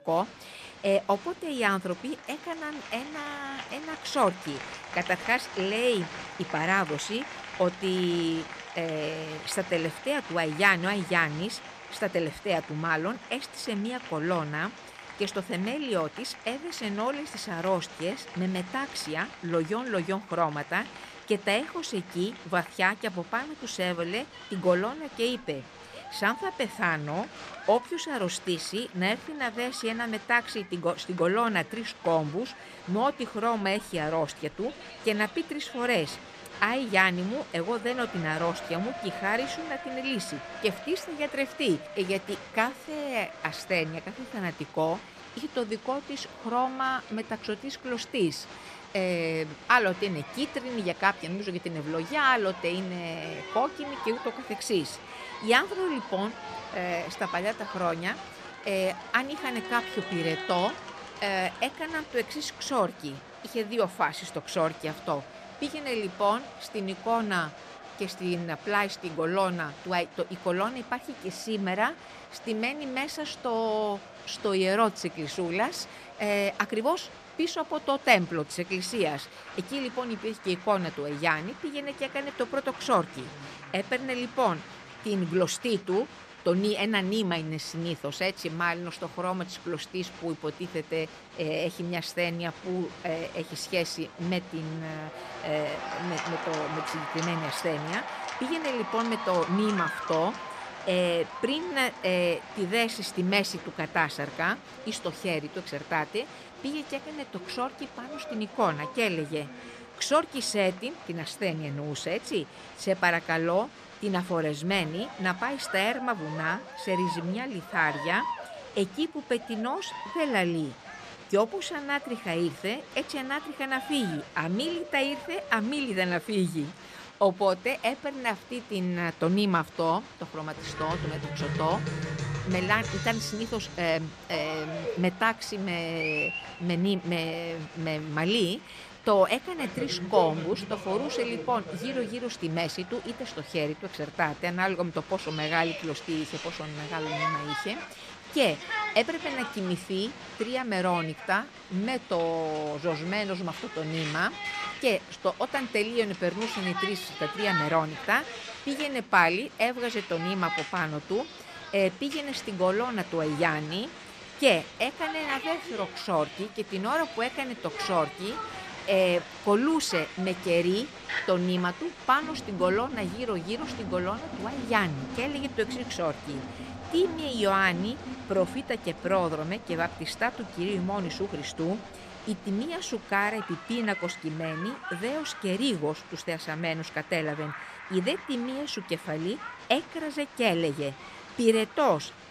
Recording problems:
crowd noise; noticeable; throughout; 10 dB below the speech

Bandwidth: 14 kHz